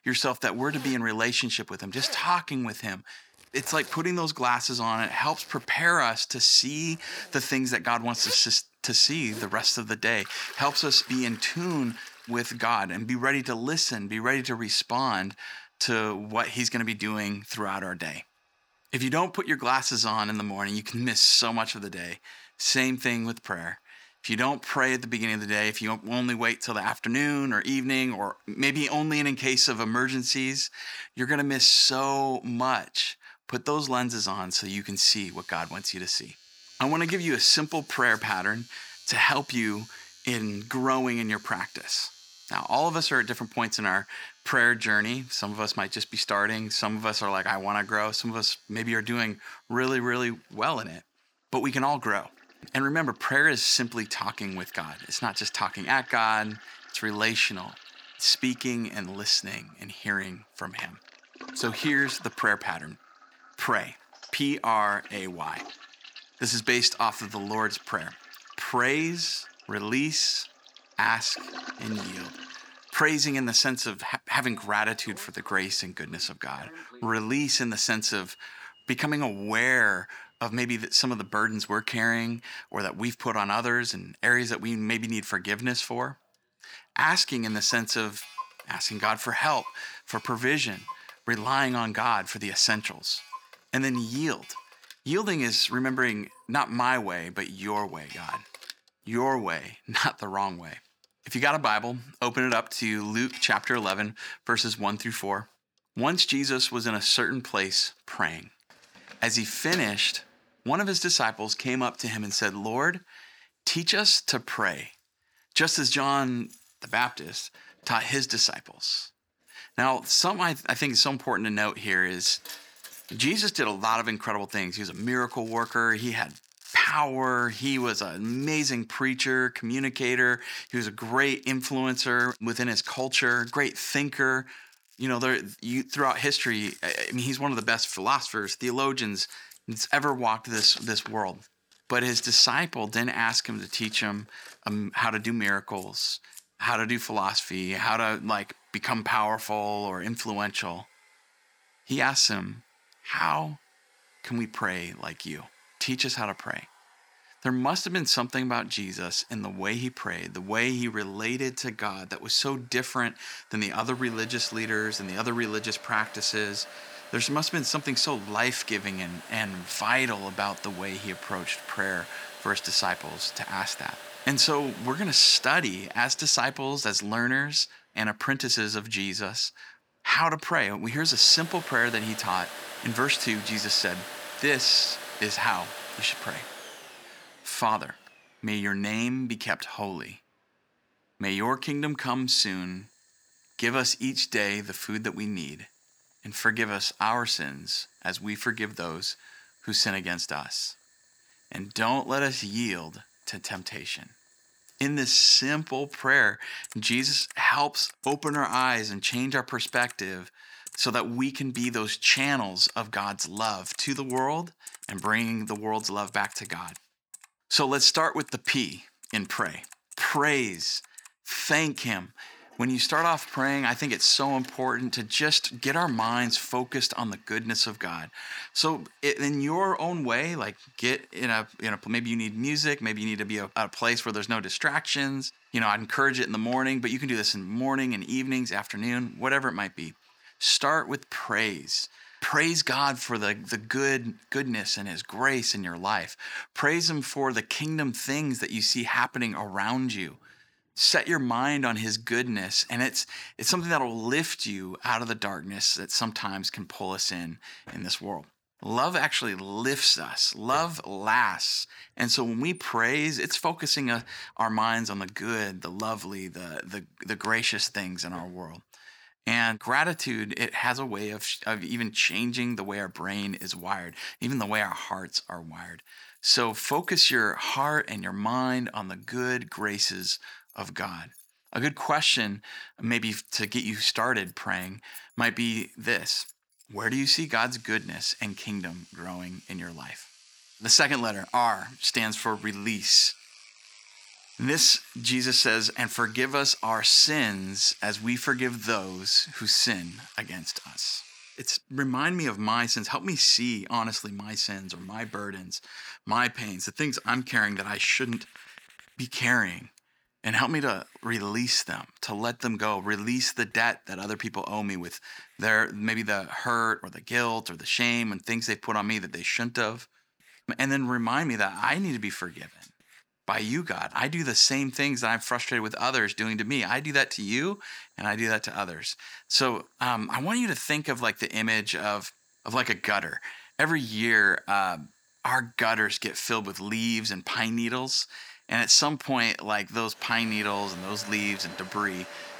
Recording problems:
thin; very slightly; fading below 350 Hz
household noises; noticeable; throughout; 20 dB below the speech

